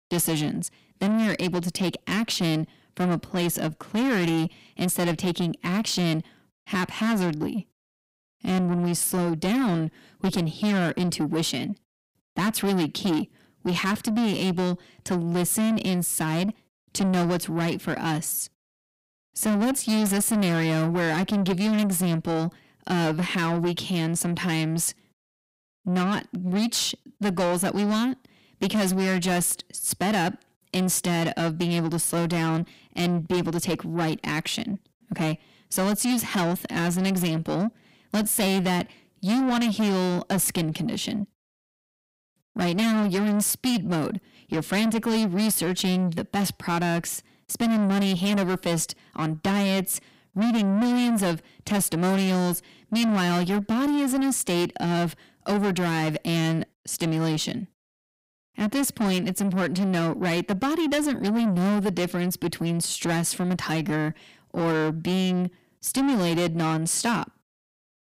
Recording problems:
distortion; heavy; 7 dB below the speech

